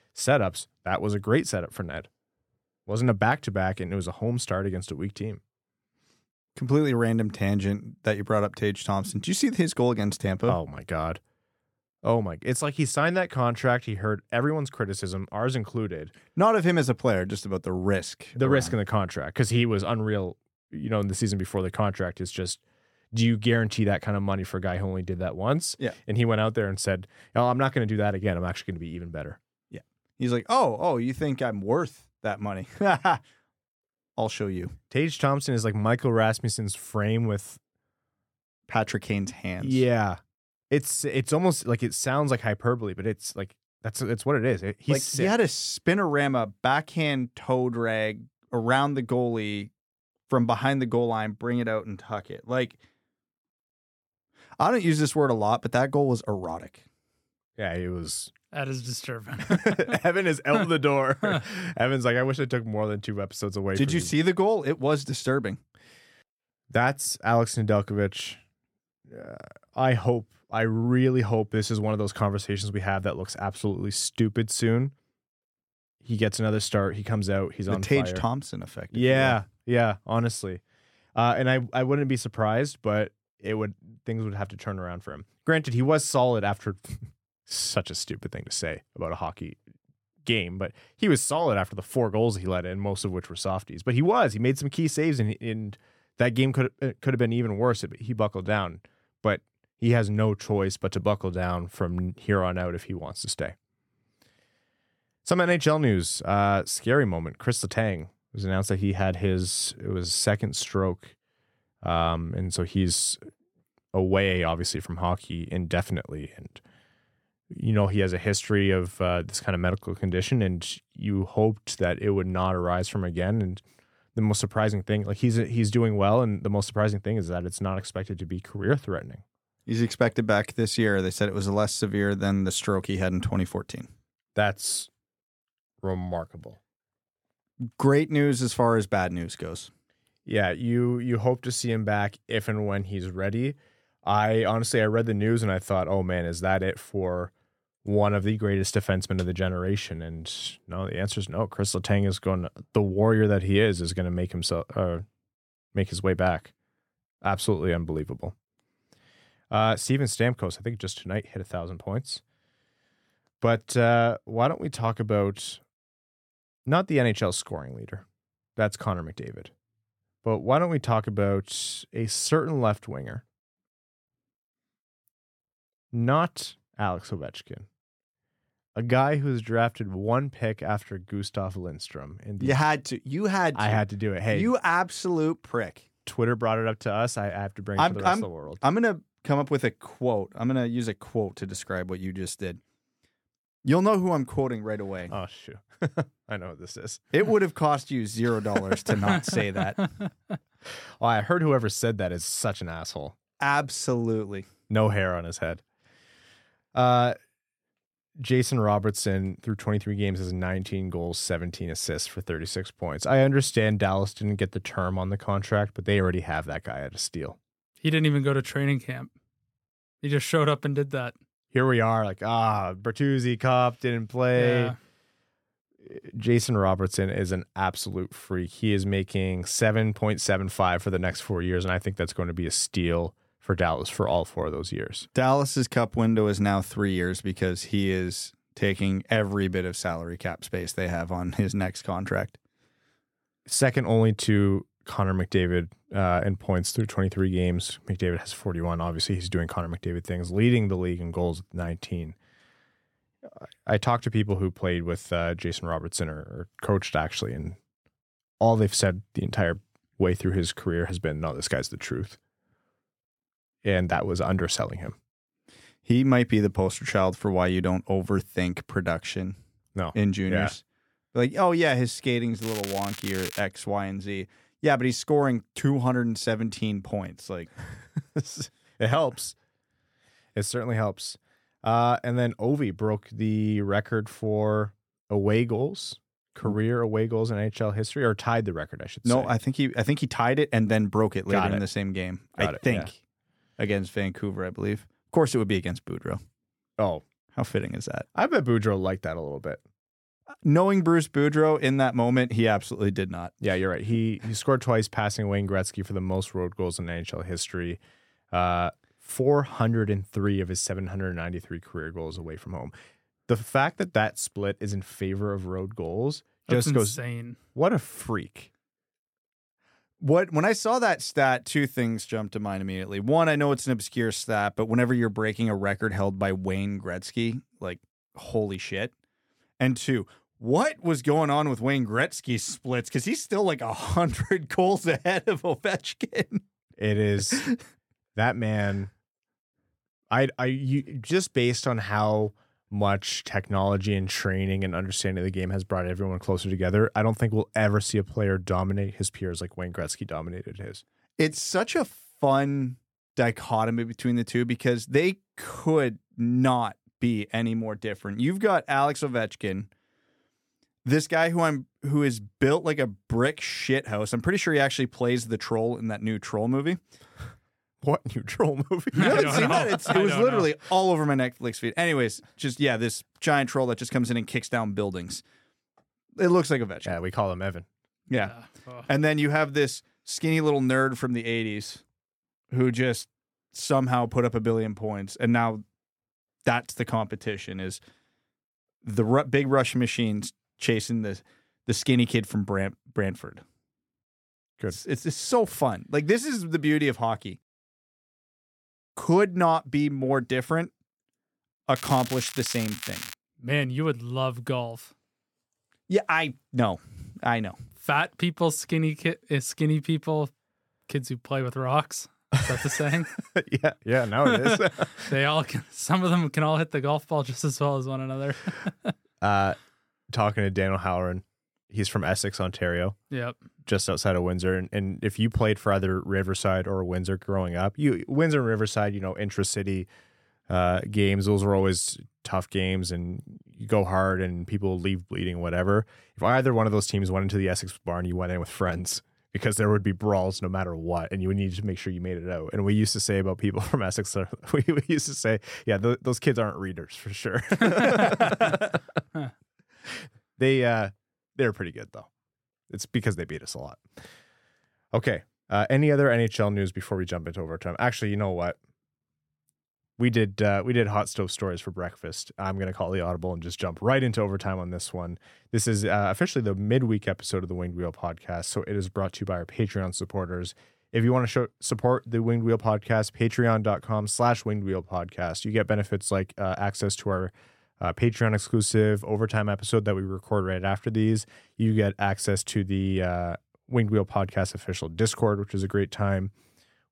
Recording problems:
crackling; loud; at 4:32 and from 6:42 to 6:43; 10 dB below the speech

